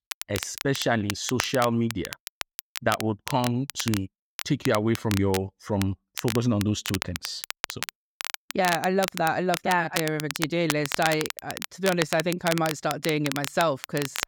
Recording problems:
crackle, like an old record; loud; 7 dB below the speech

